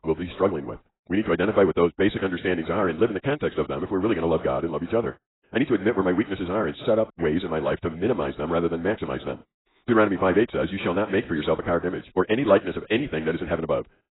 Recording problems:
garbled, watery; badly; nothing above 4 kHz
wrong speed, natural pitch; too fast; 1.8 times normal speed

